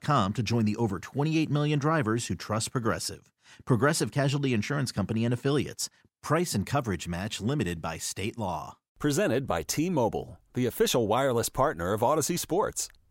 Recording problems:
none

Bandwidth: 16 kHz